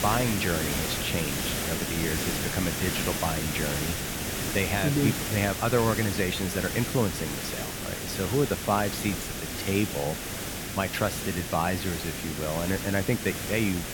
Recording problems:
hiss; loud; throughout; 2 dB below the speech

